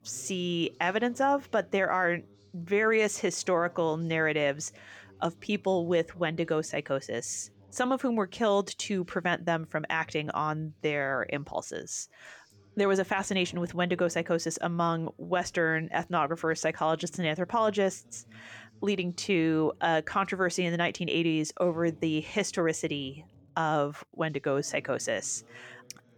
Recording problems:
background chatter; faint; throughout; 2 voices, 30 dB below the speech

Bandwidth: 18.5 kHz